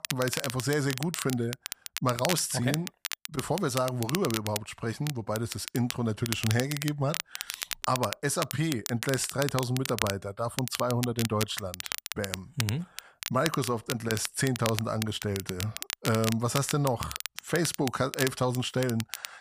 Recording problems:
crackle, like an old record; loud; 6 dB below the speech

